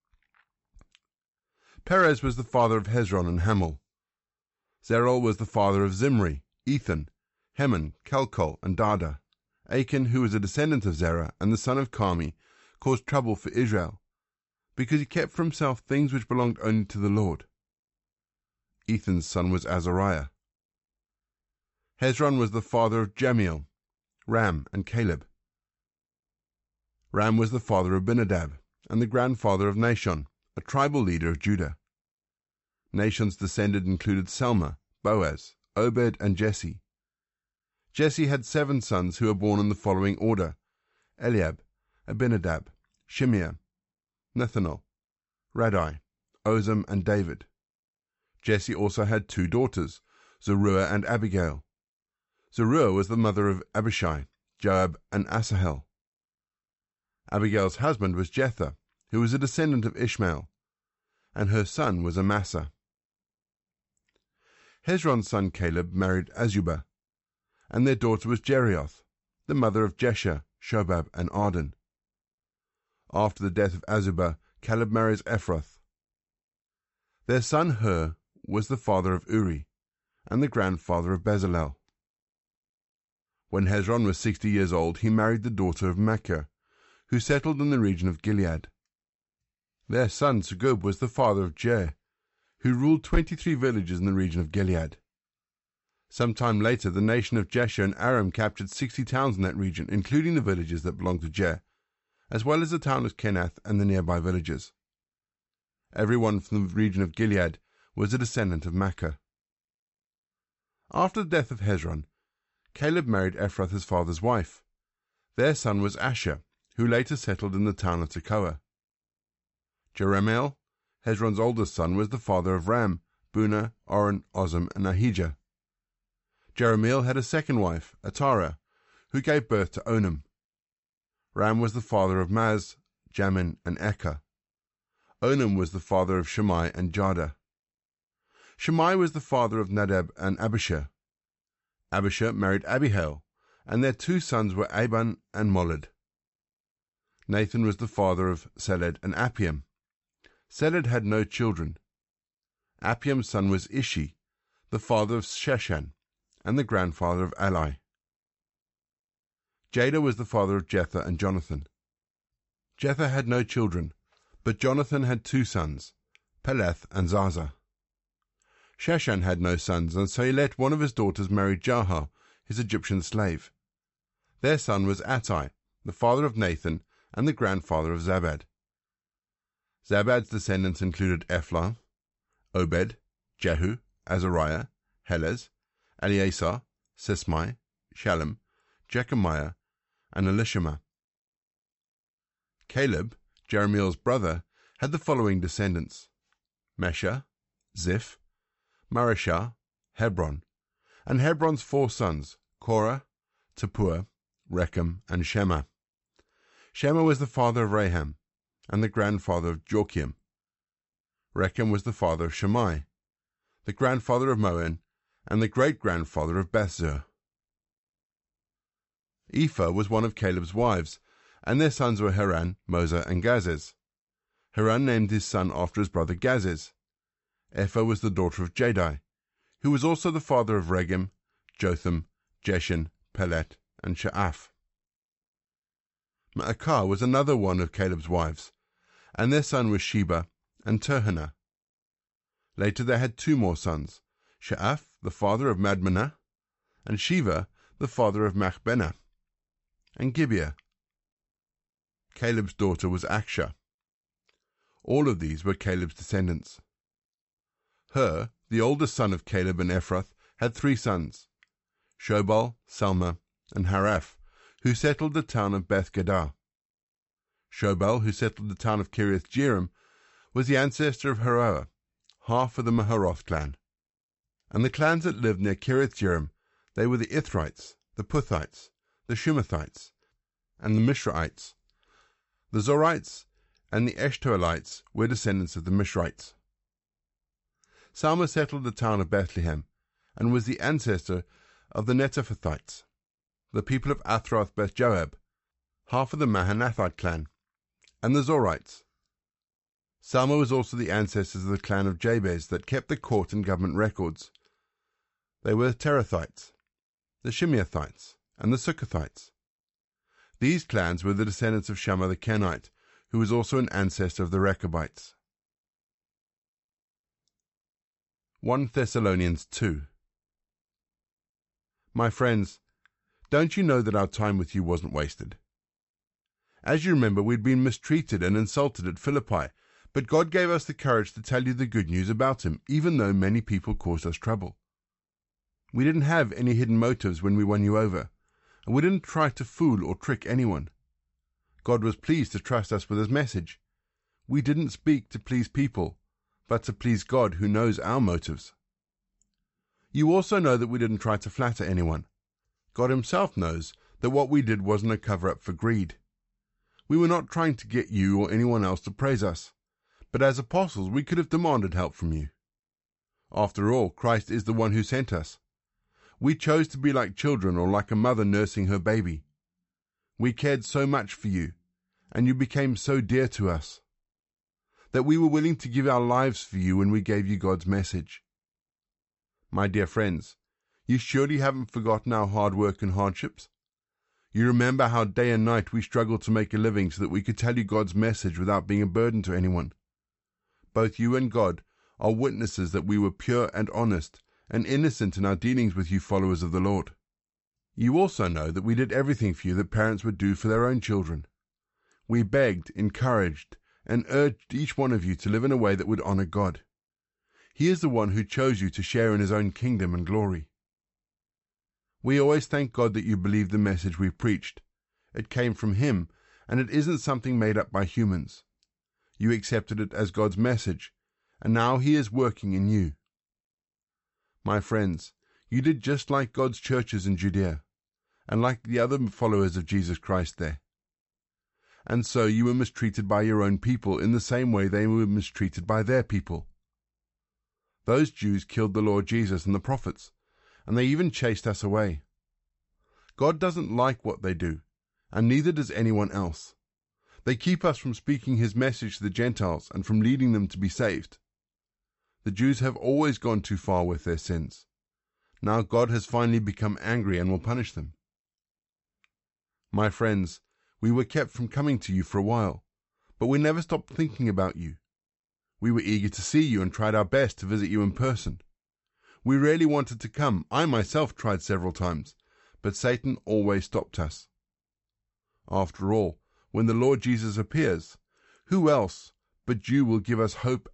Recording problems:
high frequencies cut off; noticeable; nothing above 8 kHz

